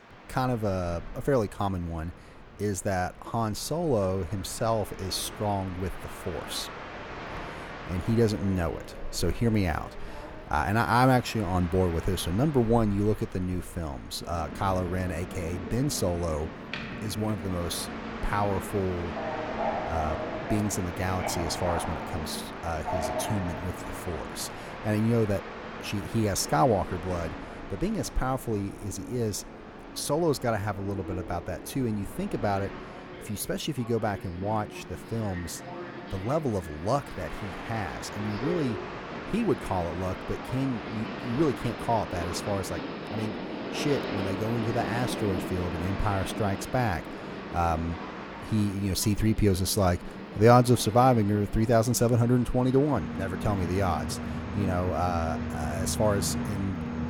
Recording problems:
train or aircraft noise; loud; throughout; 8 dB below the speech

